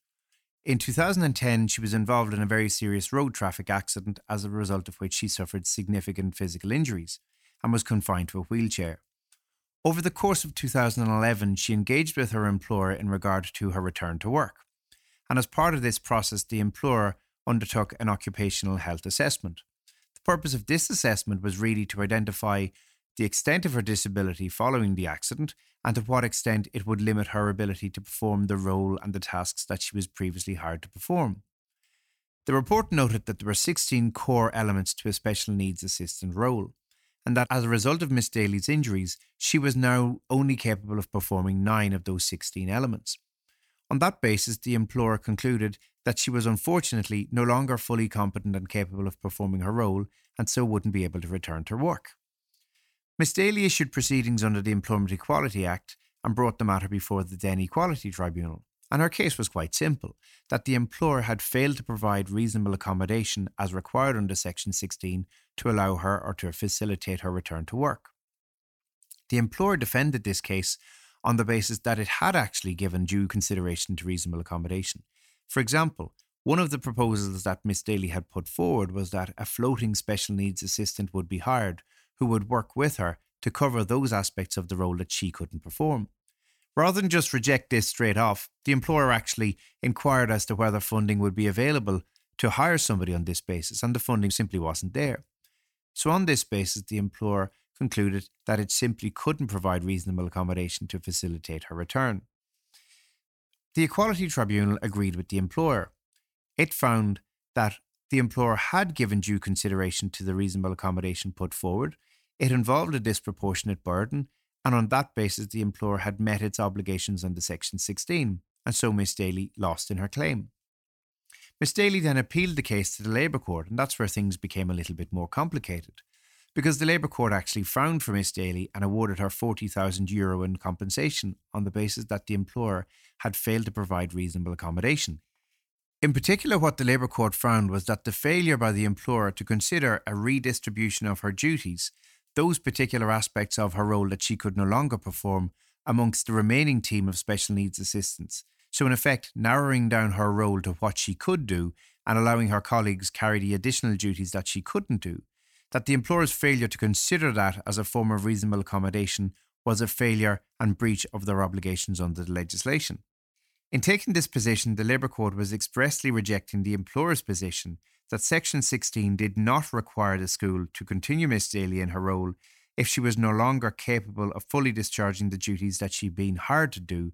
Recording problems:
none

